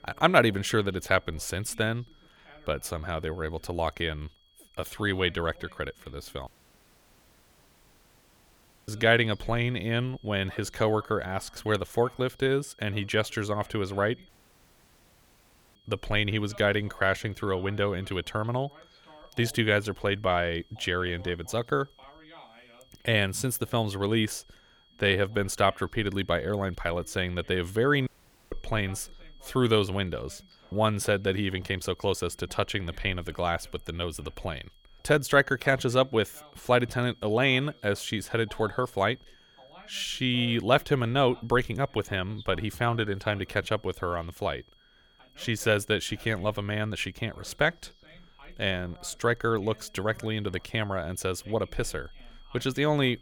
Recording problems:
high-pitched whine; faint; throughout; 3.5 kHz, 30 dB below the speech
voice in the background; faint; throughout; 25 dB below the speech
audio cutting out; at 6.5 s for 2.5 s, at 14 s for 1.5 s and at 28 s

